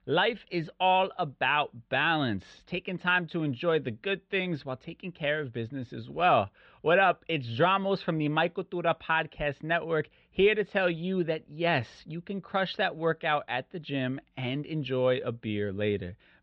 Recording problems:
muffled; very; fading above 3.5 kHz

